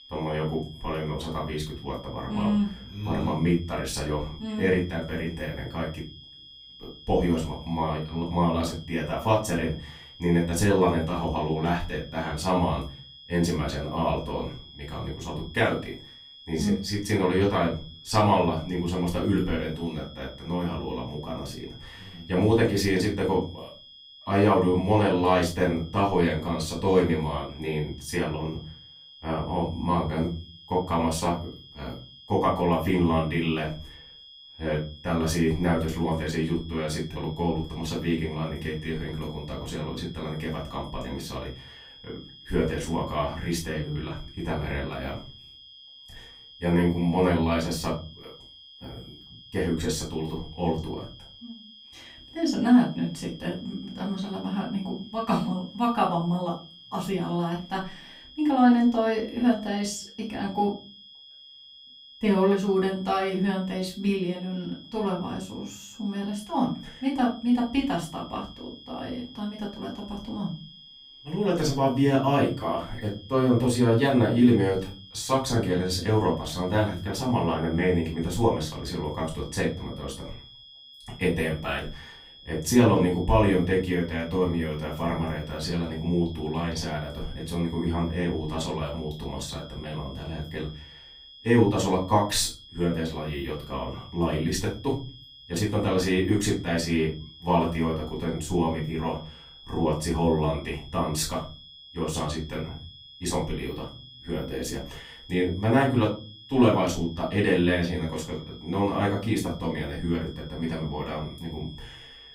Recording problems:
off-mic speech; far
room echo; slight; dies away in 0.3 s
high-pitched whine; noticeable; throughout; 3.5 kHz, 20 dB below the speech

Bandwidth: 15.5 kHz